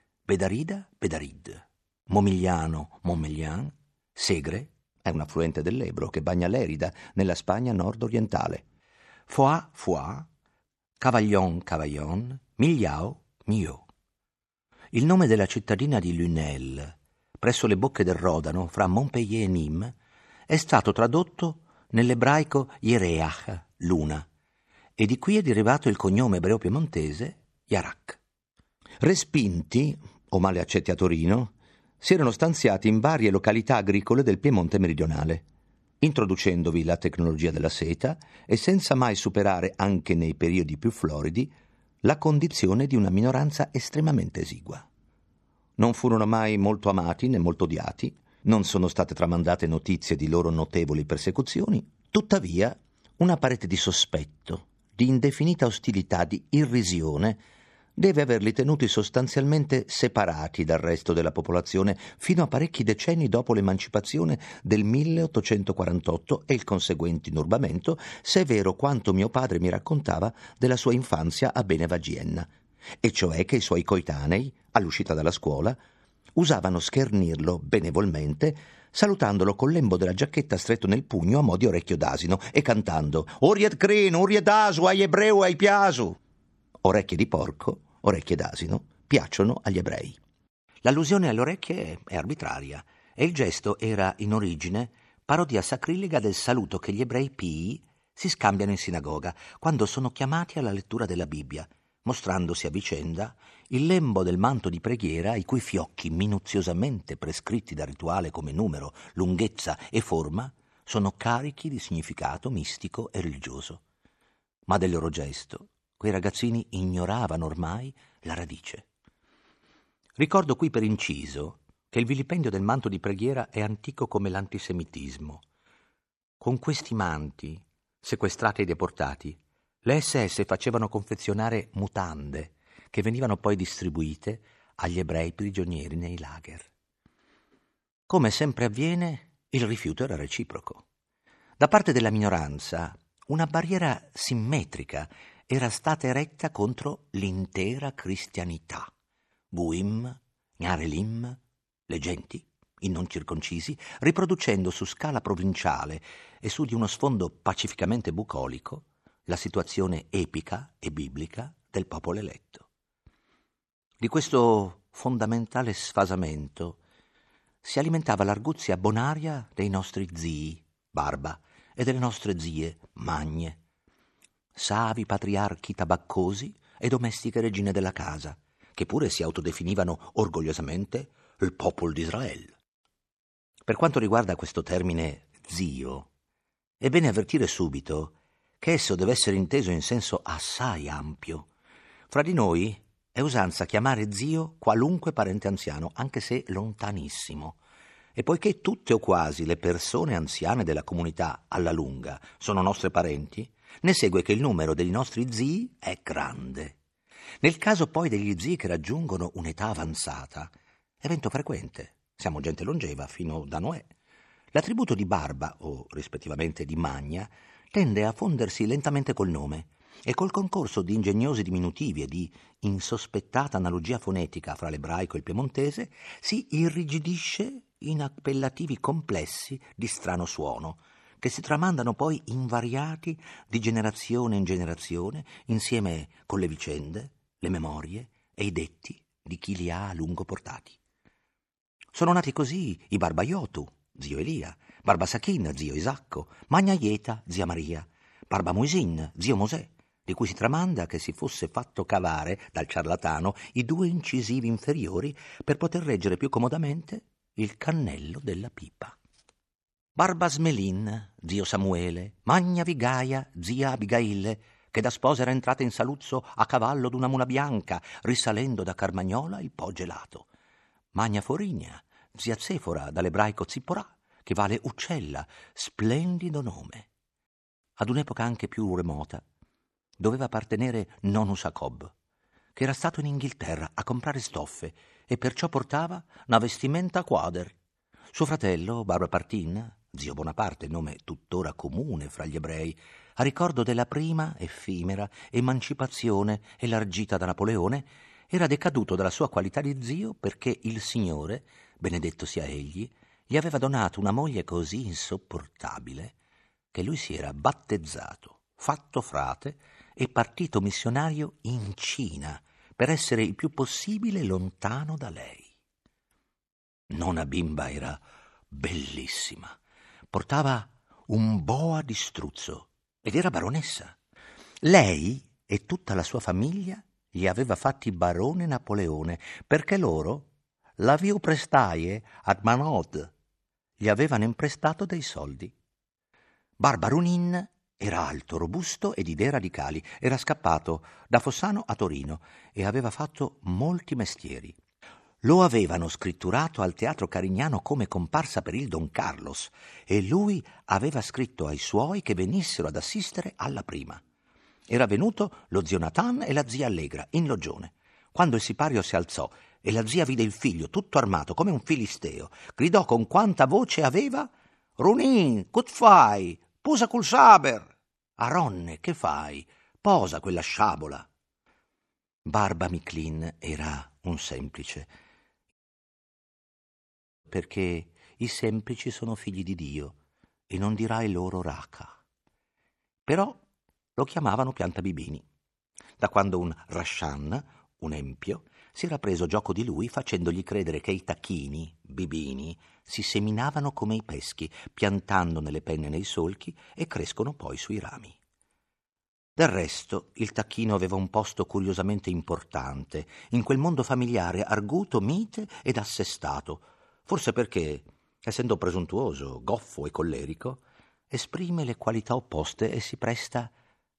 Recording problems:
audio cutting out; at 6:16 for 1.5 s

